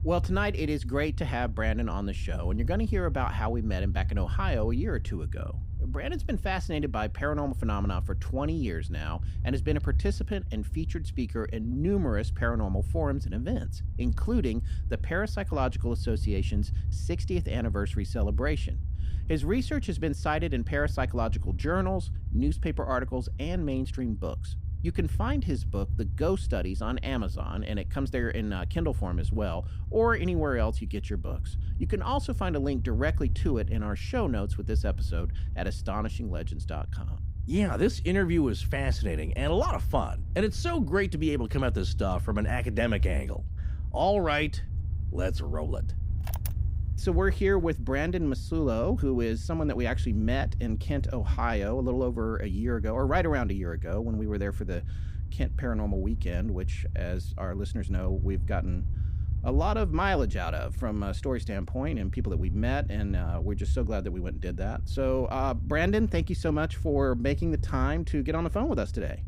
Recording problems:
low rumble; noticeable; throughout; 15 dB below the speech

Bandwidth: 15.5 kHz